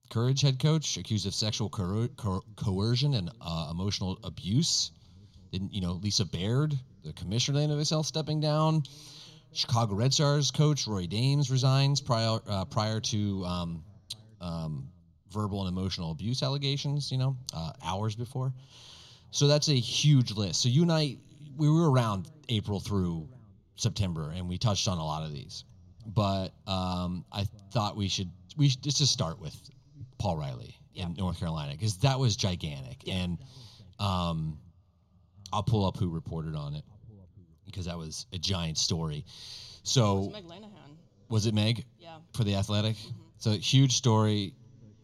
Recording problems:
room echo; slight; dies away in 3 s

